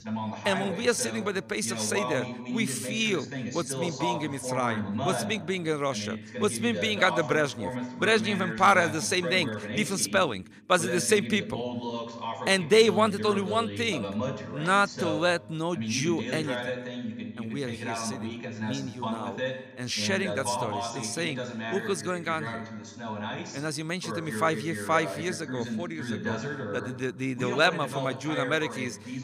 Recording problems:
voice in the background; loud; throughout; 6 dB below the speech

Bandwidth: 15 kHz